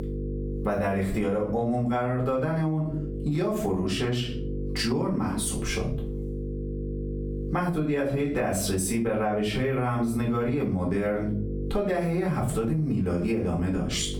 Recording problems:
off-mic speech; far
squashed, flat; heavily
room echo; slight; dies away in 0.3 s
electrical hum; noticeable; throughout; 50 Hz, 15 dB below the speech

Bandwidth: 18 kHz